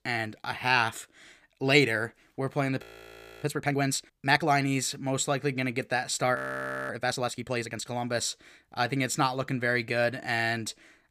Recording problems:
audio freezing; at 3 s for 0.5 s and at 6.5 s for 0.5 s

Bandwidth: 15 kHz